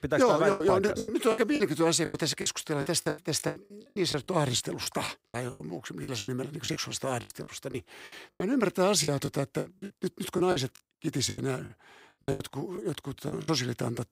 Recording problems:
choppy; very; 16% of the speech affected

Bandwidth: 15.5 kHz